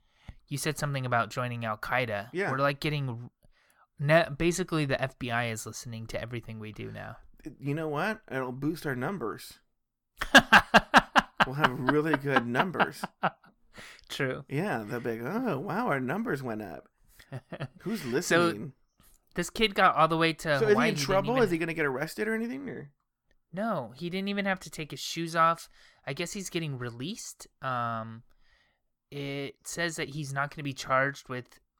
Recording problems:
none

